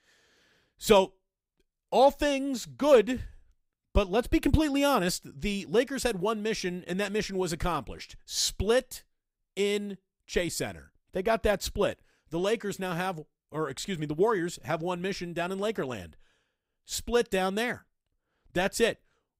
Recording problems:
none

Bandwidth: 15.5 kHz